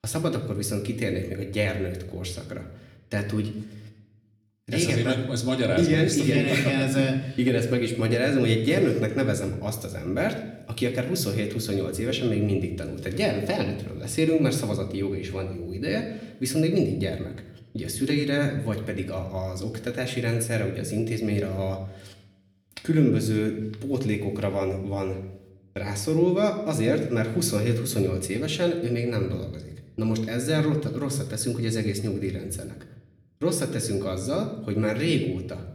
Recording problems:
room echo; slight; dies away in 0.7 s
off-mic speech; somewhat distant

